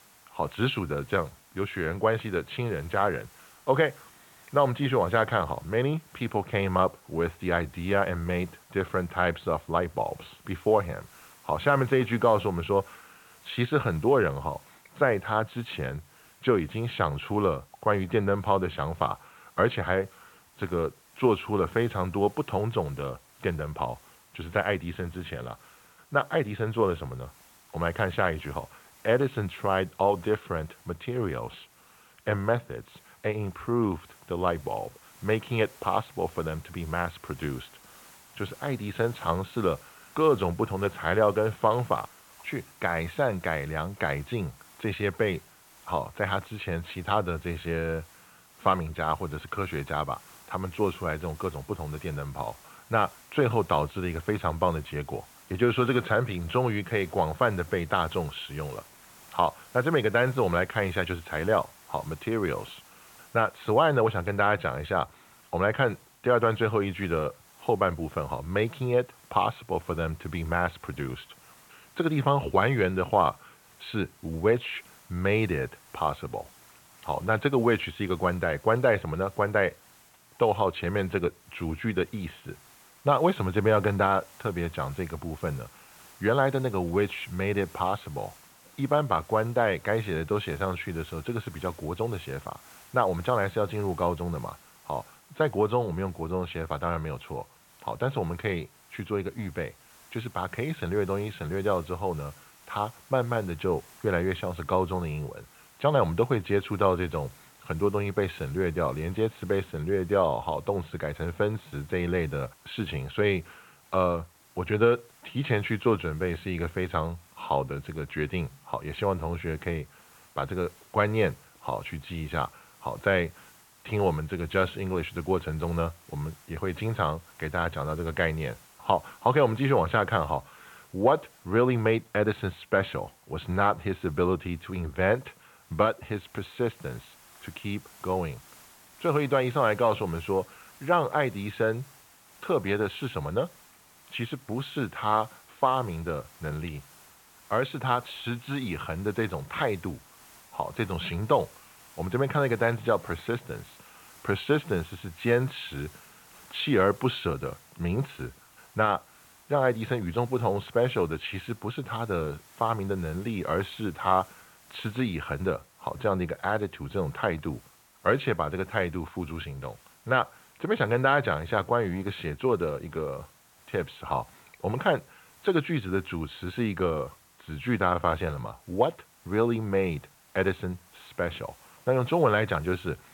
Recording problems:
high frequencies cut off; severe; nothing above 4 kHz
hiss; faint; throughout; 25 dB below the speech

